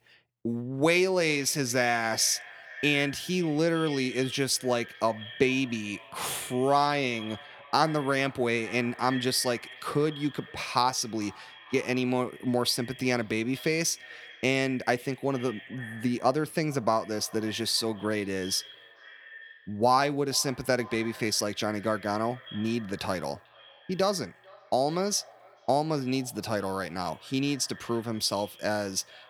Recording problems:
echo of what is said; noticeable; throughout; 440 ms later, 20 dB below the speech

